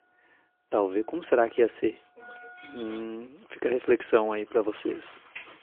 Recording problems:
phone-call audio; poor line; nothing above 3 kHz
traffic noise; faint; throughout; 20 dB below the speech

